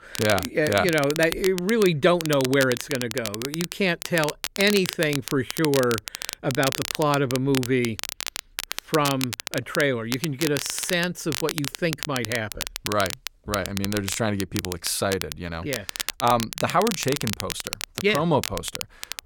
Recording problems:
crackle, like an old record; loud; 7 dB below the speech

